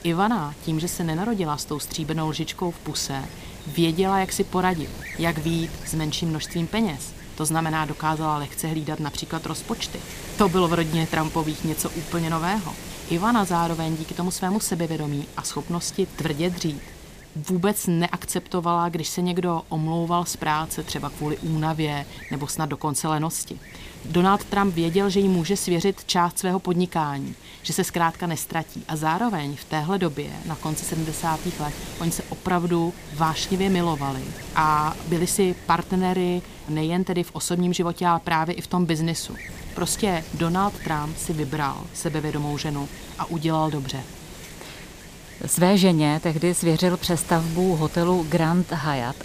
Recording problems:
wind noise on the microphone; occasional gusts; 15 dB below the speech

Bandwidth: 15 kHz